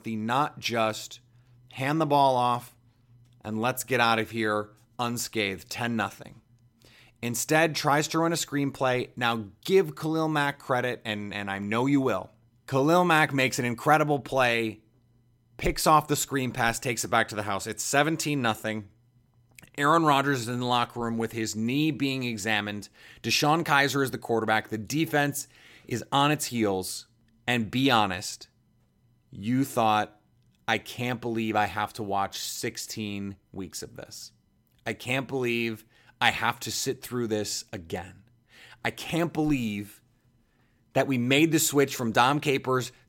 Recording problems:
none

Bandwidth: 16.5 kHz